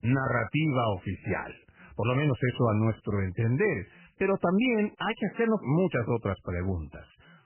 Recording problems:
garbled, watery; badly; nothing above 3 kHz

